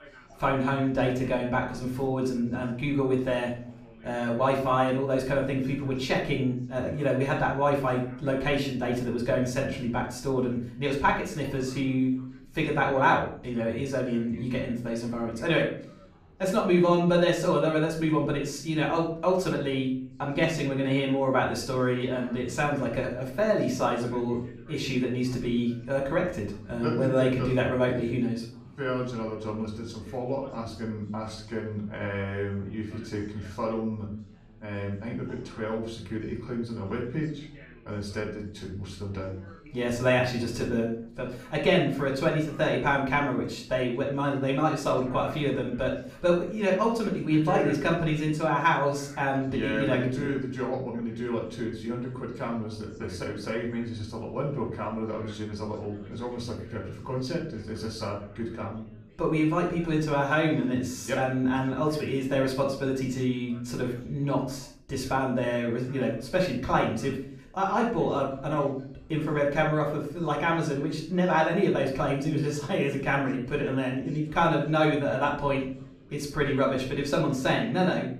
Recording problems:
off-mic speech; far
room echo; noticeable; dies away in 0.4 s
background chatter; faint; throughout; 4 voices, 25 dB below the speech

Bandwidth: 15 kHz